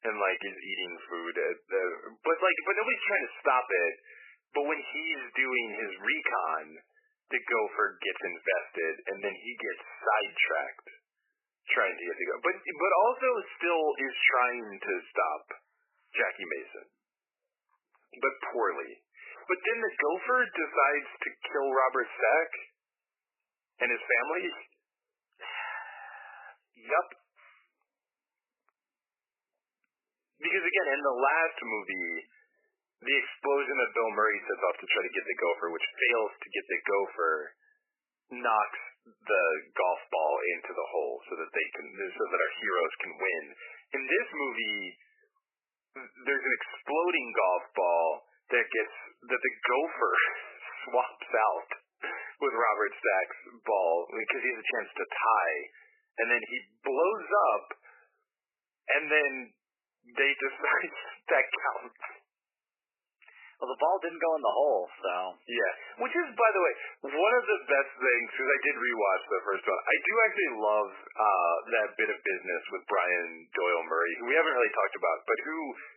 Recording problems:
garbled, watery; badly; nothing above 3 kHz
thin; very; fading below 400 Hz

